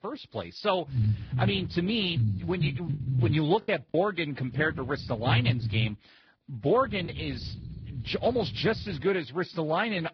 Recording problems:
garbled, watery; badly; nothing above 5 kHz
low rumble; noticeable; from 1 to 3.5 s, from 4.5 to 6 s and from 7 to 9 s; 15 dB below the speech
choppy; occasionally; from 3 to 7 s; 4% of the speech affected

